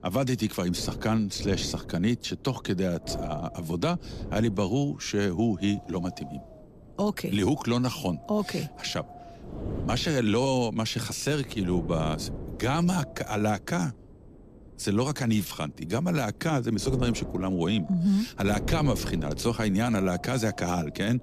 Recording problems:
wind noise on the microphone; occasional gusts; 15 dB below the speech

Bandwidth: 14.5 kHz